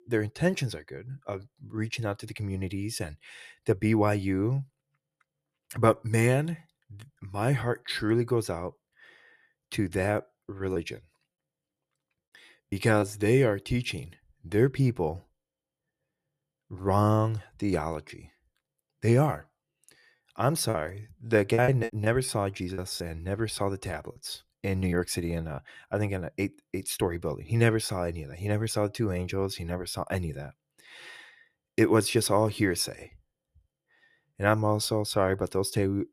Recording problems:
choppy; very; from 11 to 13 s, from 21 to 23 s and from 24 to 26 s; 7% of the speech affected

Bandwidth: 14.5 kHz